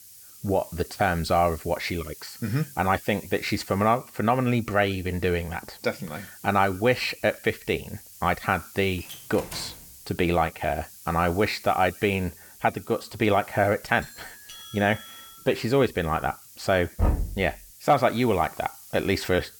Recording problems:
hiss; noticeable; throughout; 20 dB below the speech
door banging; faint; at 9 s; peak 10 dB below the speech
doorbell; faint; from 14 to 15 s; peak 15 dB below the speech
door banging; noticeable; at 17 s; peak 1 dB below the speech

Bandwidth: 18.5 kHz